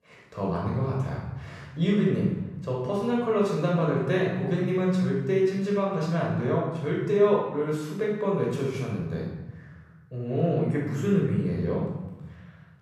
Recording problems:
off-mic speech; far
room echo; noticeable; dies away in 1.1 s

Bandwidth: 14.5 kHz